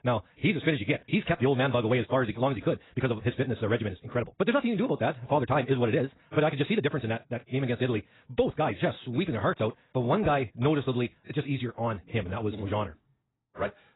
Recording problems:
garbled, watery; badly; nothing above 4 kHz
wrong speed, natural pitch; too fast; 1.7 times normal speed

